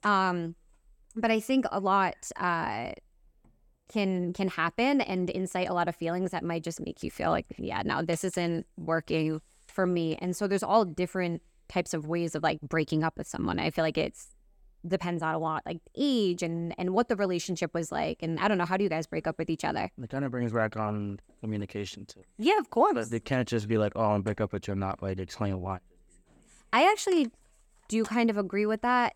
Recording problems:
none

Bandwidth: 17.5 kHz